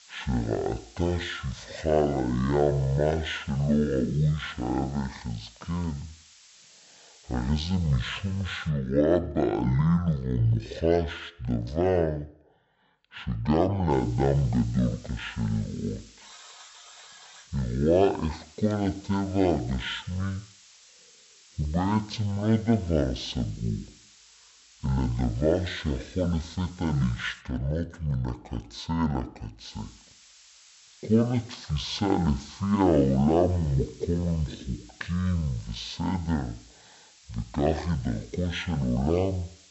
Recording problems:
wrong speed and pitch; too slow and too low; 0.5 times normal speed
hiss; faint; until 8.5 s, from 14 to 27 s and from 30 s on; 25 dB below the speech
alarm; faint; from 16 to 17 s; peak 20 dB below the speech

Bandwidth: 8 kHz